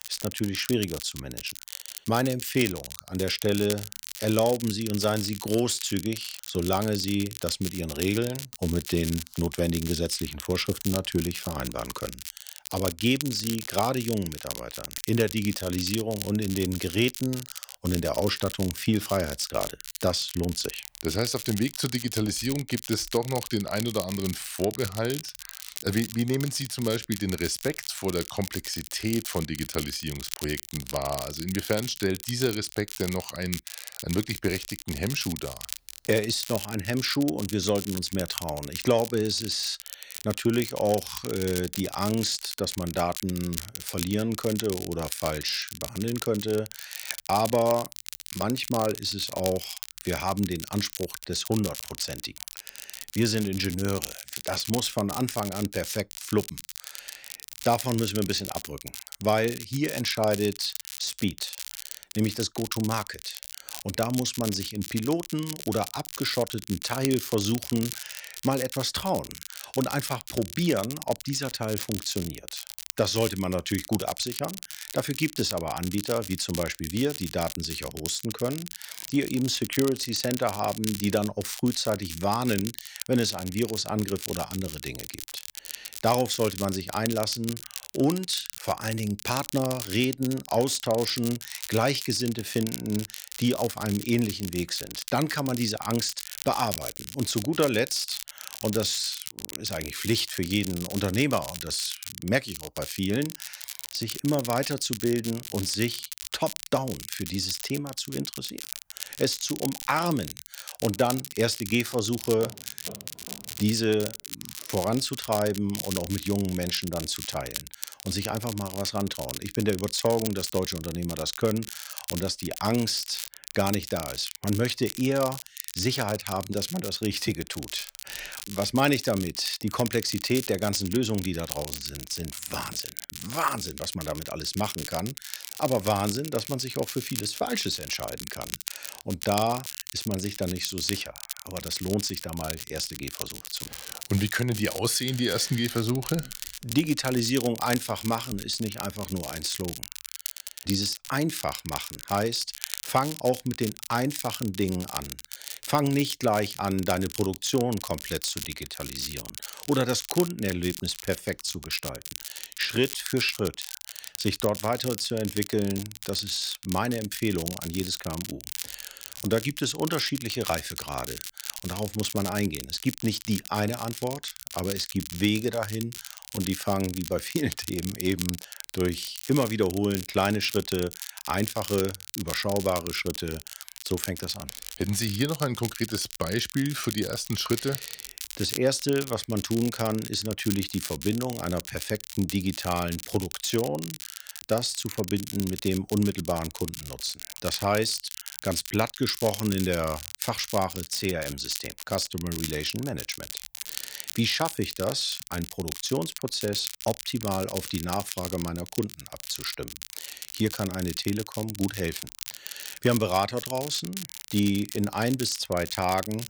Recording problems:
crackle, like an old record; loud; 8 dB below the speech
footsteps; faint; from 1:52 to 1:54; peak 15 dB below the speech

